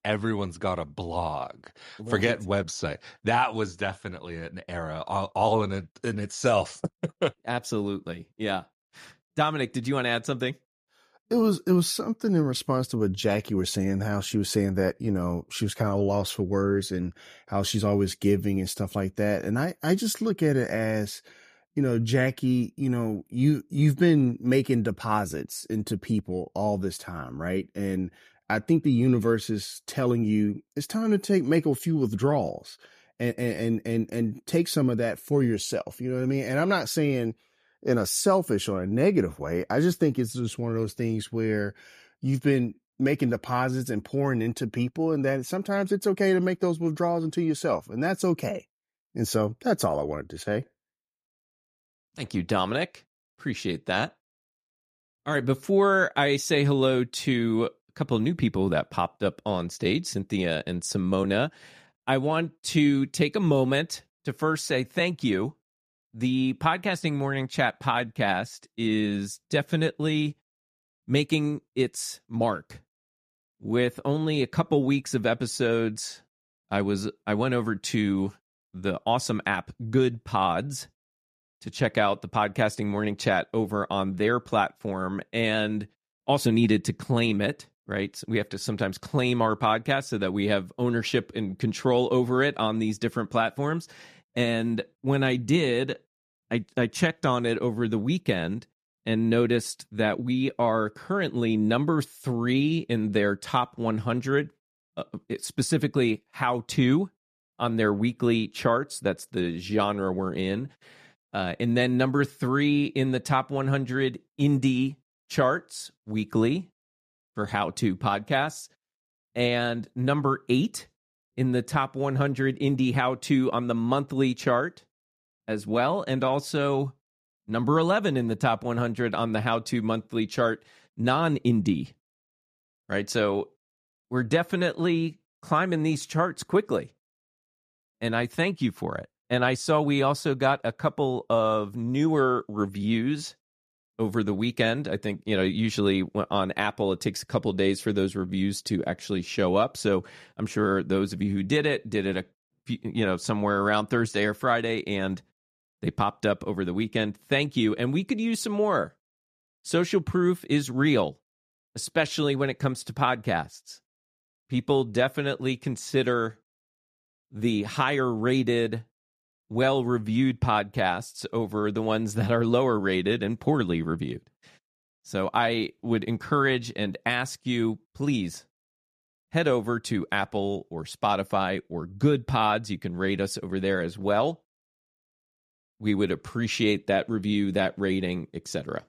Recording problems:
none

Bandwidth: 14.5 kHz